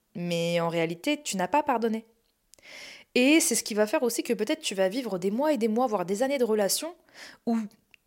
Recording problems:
none

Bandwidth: 16 kHz